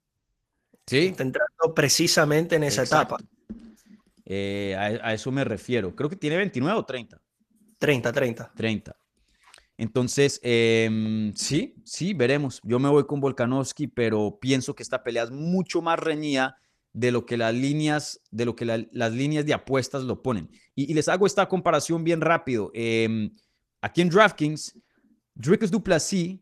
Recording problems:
garbled, watery; slightly; nothing above 14 kHz
uneven, jittery; strongly; from 1.5 to 26 s

